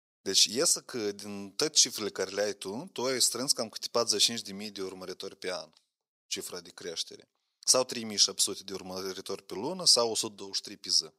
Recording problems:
thin; very; fading below 500 Hz

